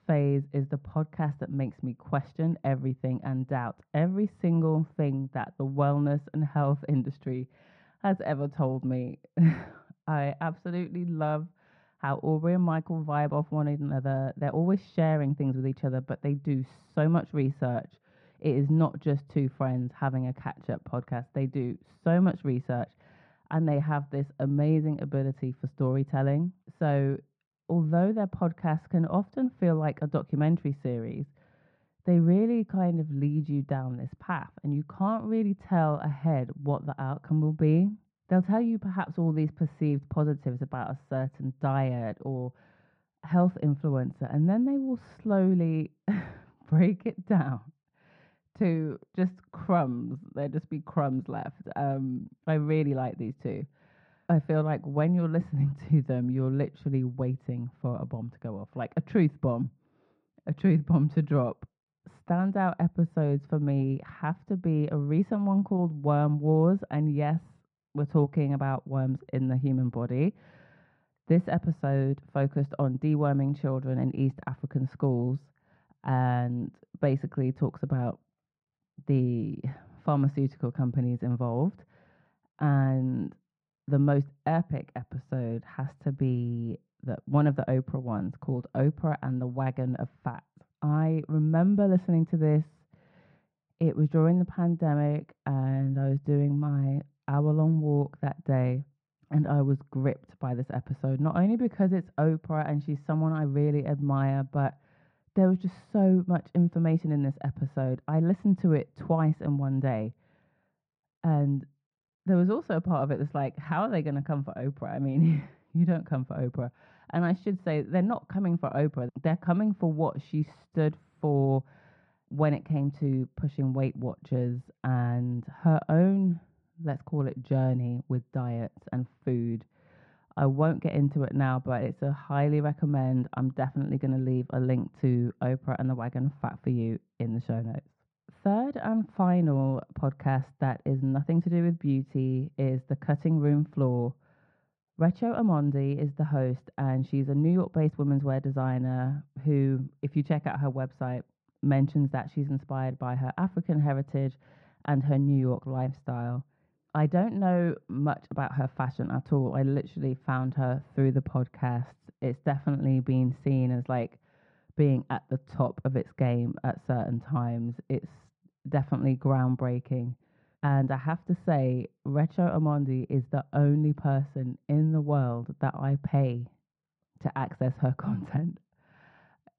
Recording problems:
muffled; very; fading above 1 kHz

